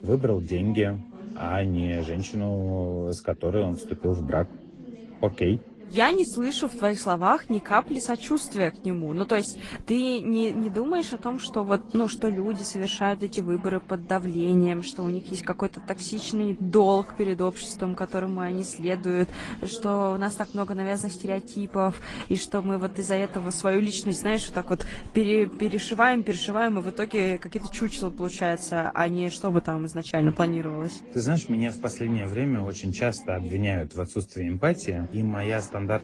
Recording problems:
garbled, watery; slightly; nothing above 10 kHz
background chatter; noticeable; throughout; 3 voices, 15 dB below the speech

